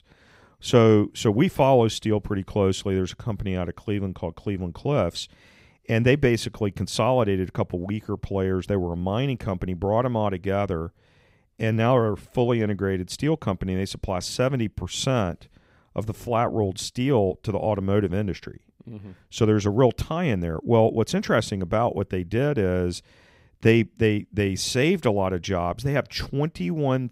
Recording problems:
none

